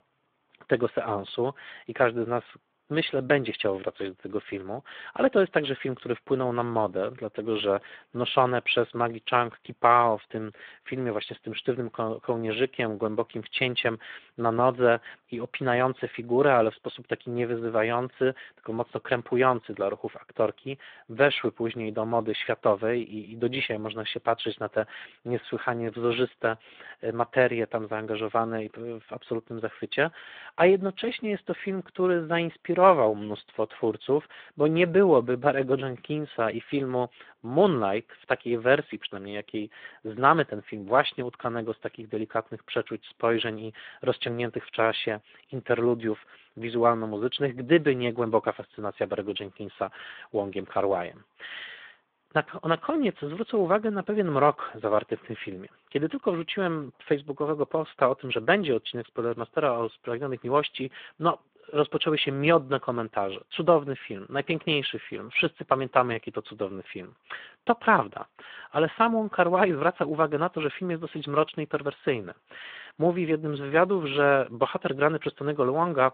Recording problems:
phone-call audio; nothing above 3.5 kHz

